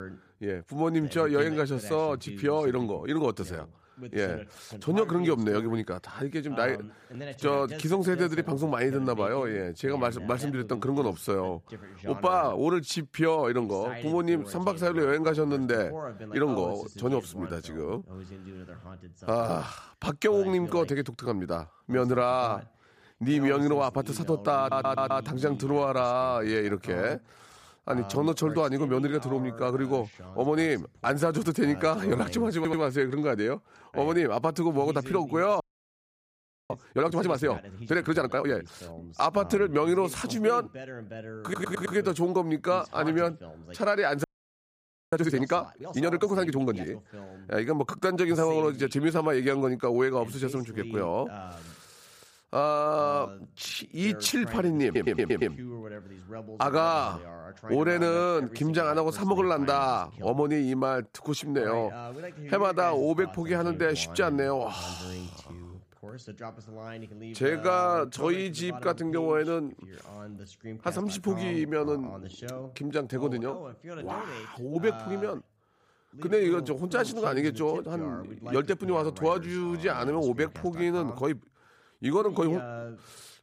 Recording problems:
voice in the background; noticeable; throughout; 15 dB below the speech
audio stuttering; 4 times, first at 25 s
audio freezing; at 36 s for 1 s and at 44 s for 1 s

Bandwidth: 15 kHz